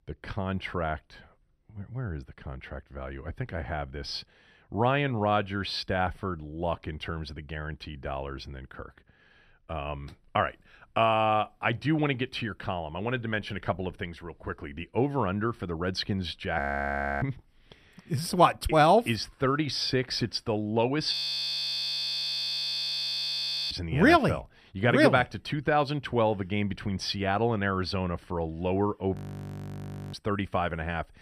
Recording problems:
audio freezing; at 17 s for 0.5 s, at 21 s for 2.5 s and at 29 s for 1 s

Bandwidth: 14.5 kHz